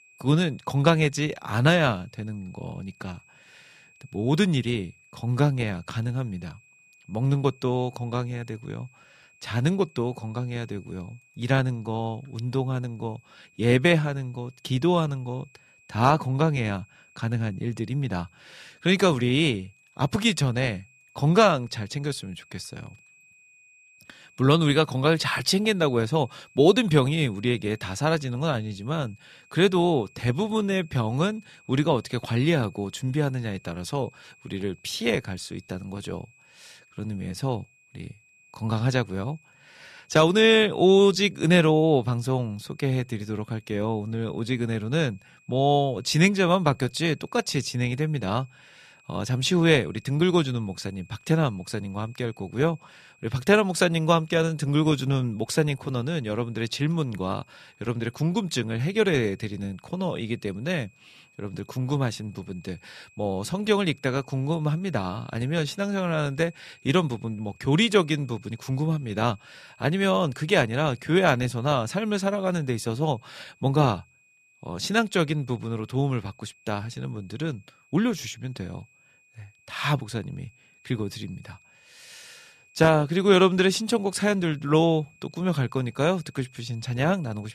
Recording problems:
high-pitched whine; faint; throughout; 2.5 kHz, 30 dB below the speech

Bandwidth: 14.5 kHz